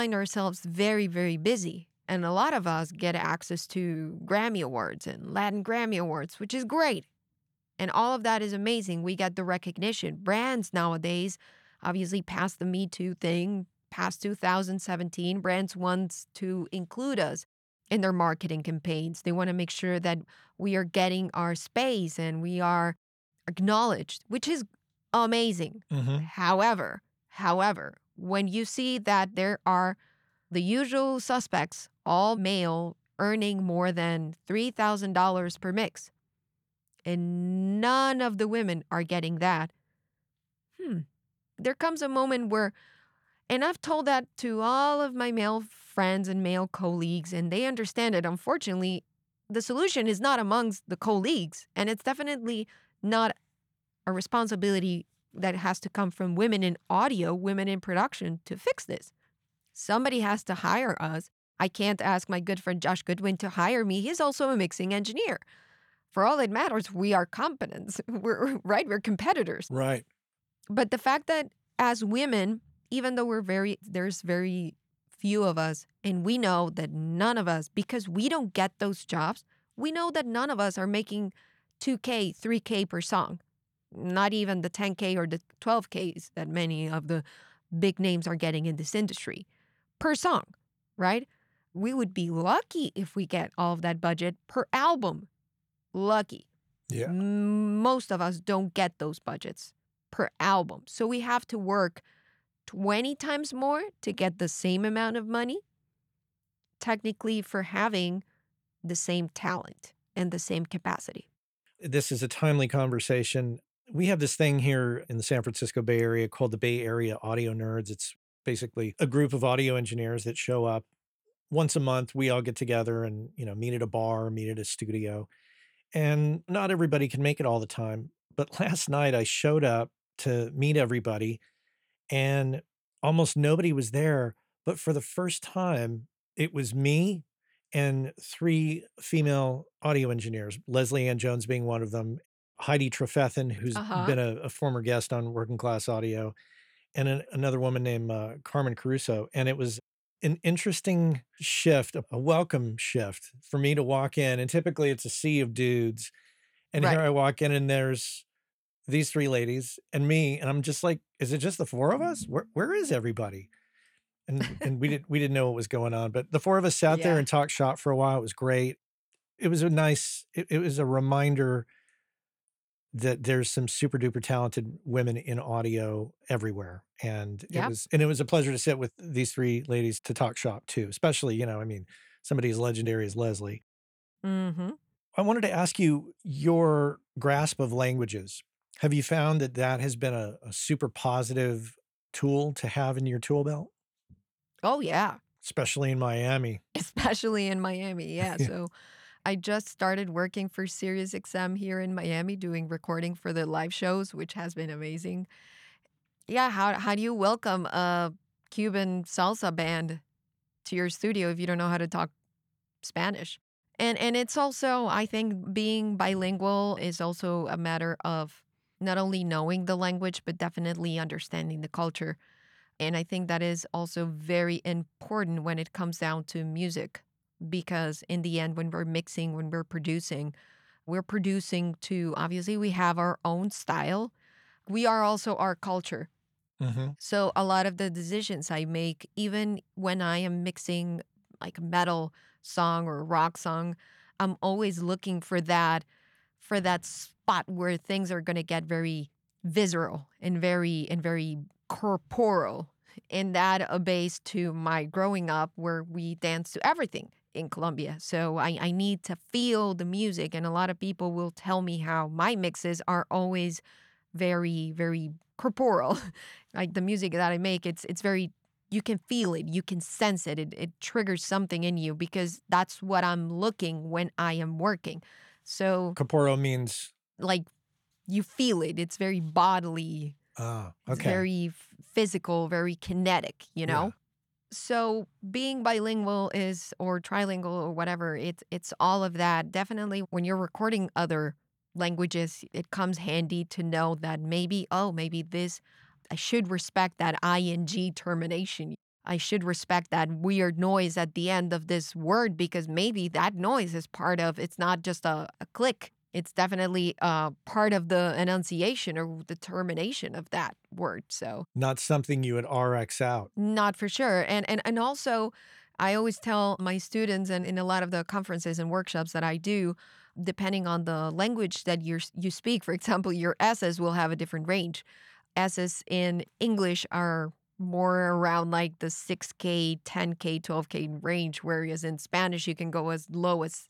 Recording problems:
abrupt cut into speech; at the start

